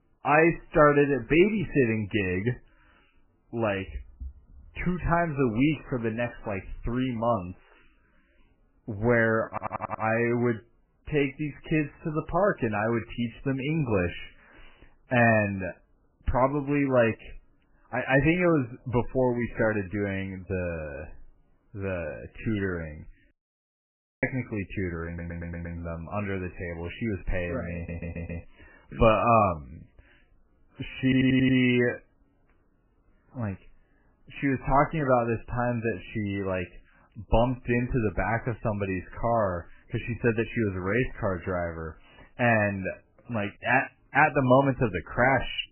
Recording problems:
garbled, watery; badly; nothing above 3 kHz
audio stuttering; 4 times, first at 9.5 s
audio cutting out; at 23 s for 1 s

